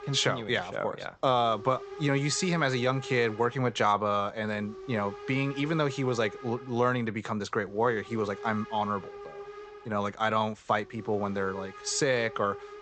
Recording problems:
high frequencies cut off; noticeable; nothing above 8 kHz
hiss; noticeable; throughout; 15 dB below the speech

